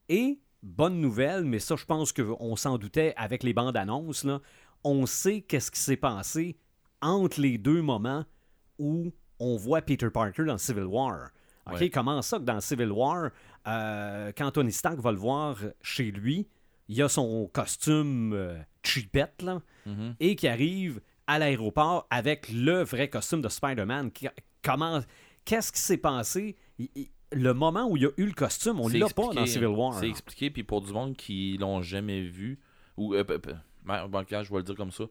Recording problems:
none

